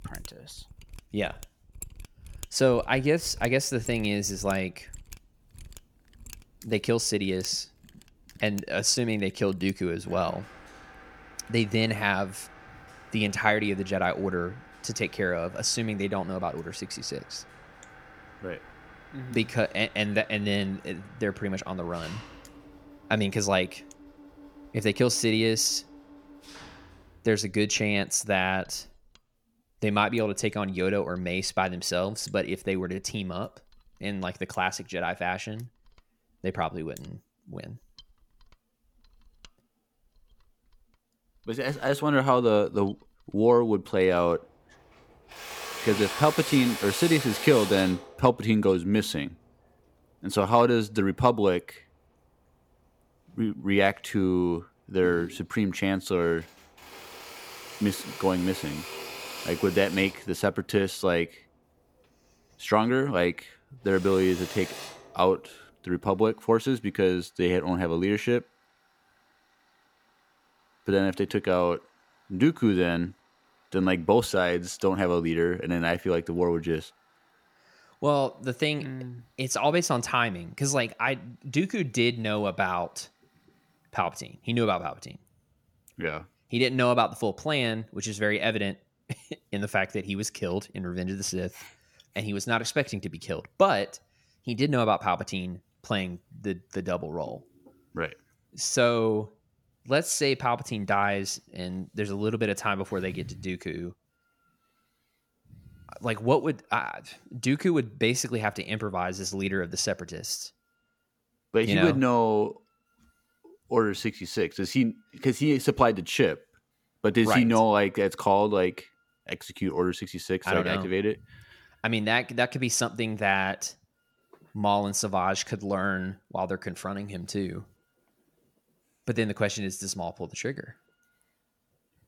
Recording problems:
machinery noise; noticeable; throughout; 15 dB below the speech

